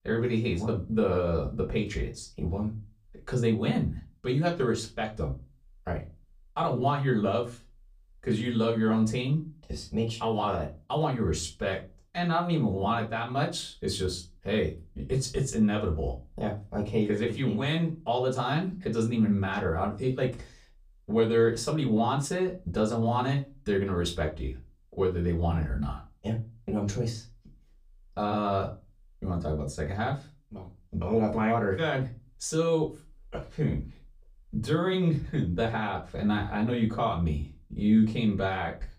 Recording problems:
off-mic speech; far
room echo; very slight; dies away in 0.2 s

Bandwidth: 15 kHz